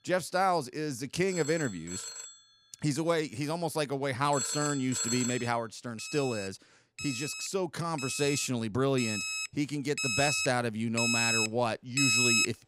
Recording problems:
alarms or sirens; very loud; throughout; as loud as the speech

